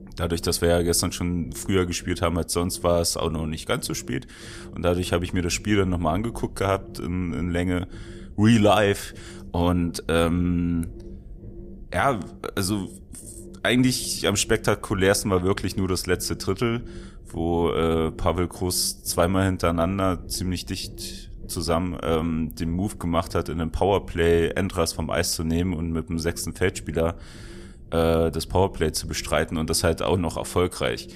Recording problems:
low rumble; faint; throughout; 25 dB below the speech

